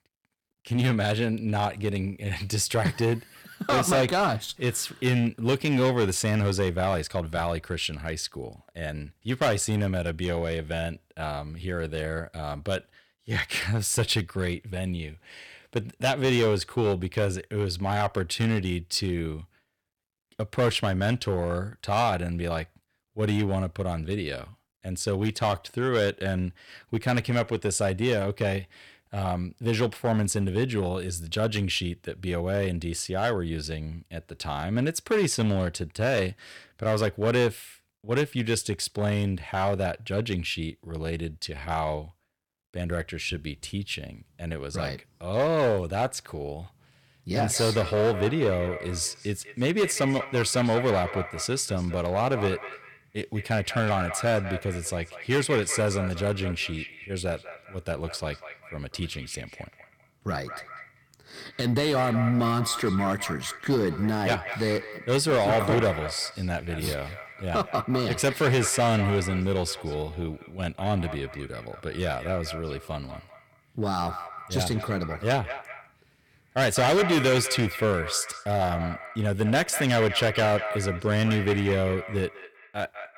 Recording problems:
echo of what is said; strong; from 47 s on; 200 ms later, 10 dB below the speech
distortion; slight; 5% of the sound clipped

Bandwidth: 18 kHz